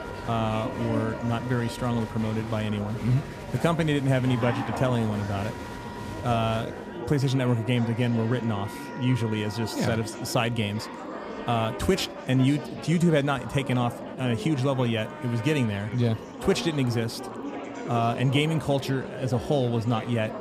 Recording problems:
murmuring crowd; loud; throughout; 10 dB below the speech
background music; noticeable; throughout; 20 dB below the speech

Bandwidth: 14.5 kHz